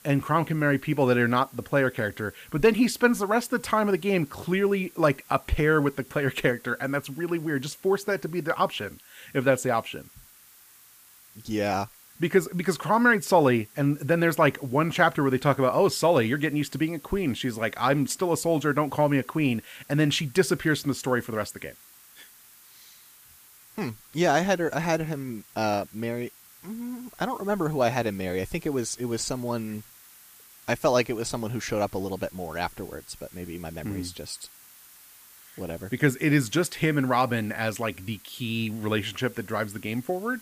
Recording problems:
hiss; faint; throughout; 25 dB below the speech

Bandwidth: 15 kHz